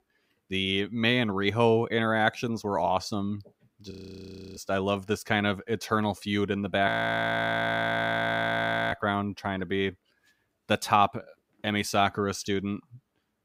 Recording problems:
audio freezing; at 4 s for 0.5 s and at 7 s for 2 s

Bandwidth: 15.5 kHz